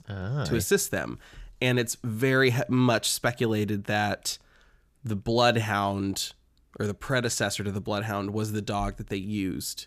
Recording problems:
none

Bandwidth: 14.5 kHz